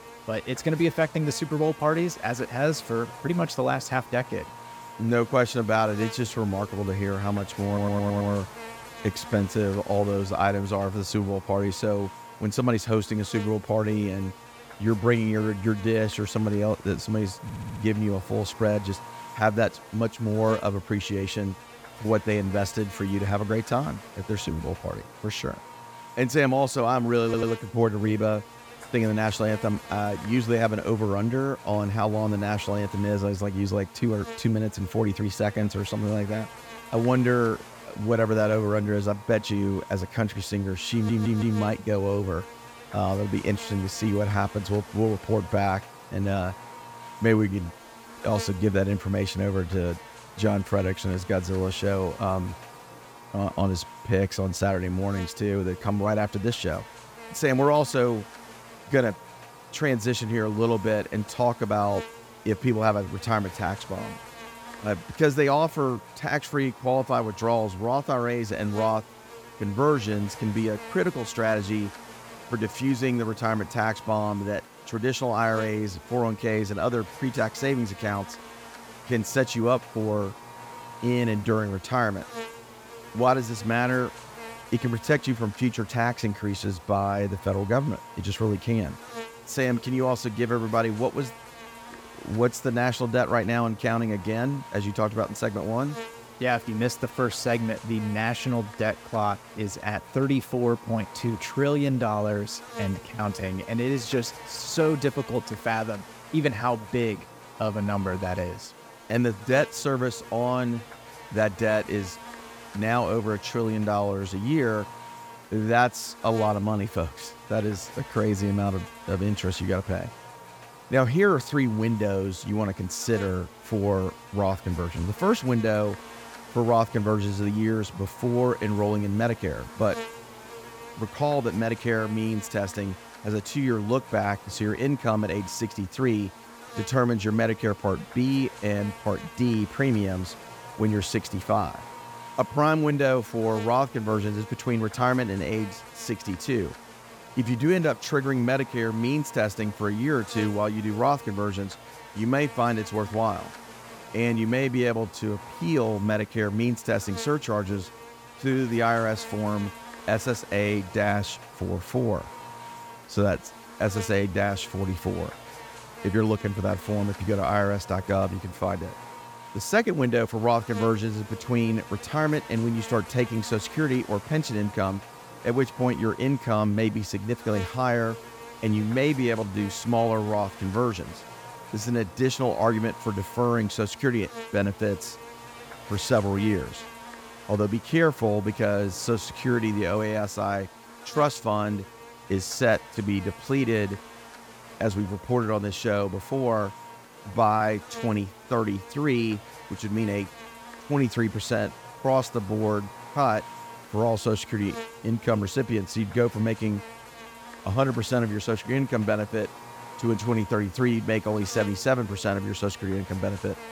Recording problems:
electrical hum; noticeable; throughout; 50 Hz, 15 dB below the speech
audio stuttering; 4 times, first at 7.5 s

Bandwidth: 18 kHz